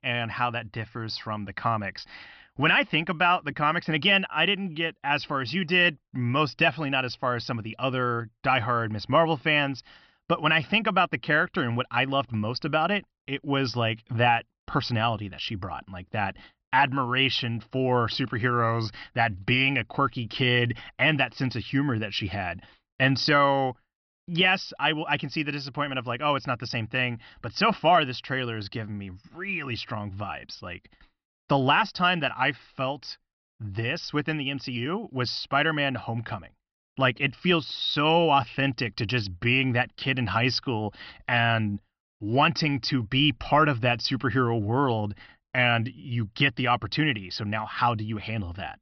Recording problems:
high frequencies cut off; noticeable; nothing above 5.5 kHz

